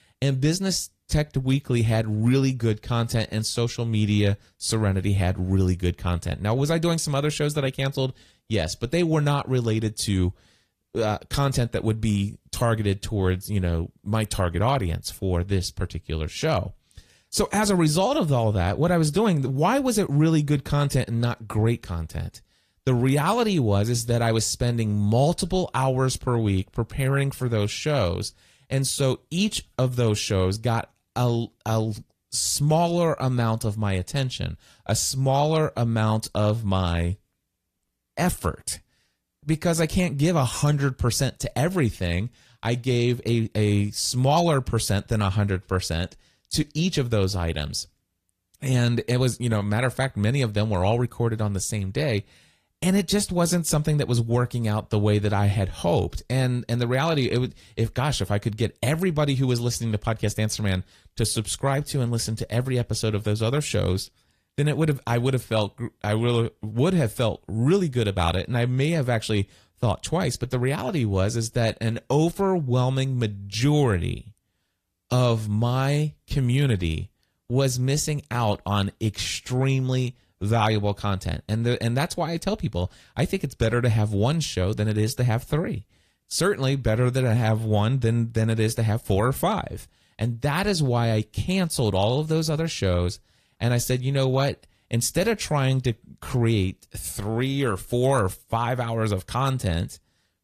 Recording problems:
garbled, watery; slightly; nothing above 14.5 kHz

